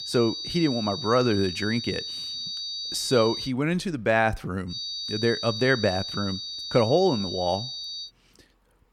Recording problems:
high-pitched whine; loud; until 3.5 s and from 4.5 to 8 s; 4.5 kHz, 6 dB below the speech

